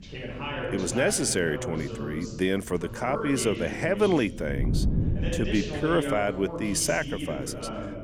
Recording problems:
voice in the background; loud; throughout; 7 dB below the speech
wind noise on the microphone; occasional gusts; 15 dB below the speech

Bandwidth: 18 kHz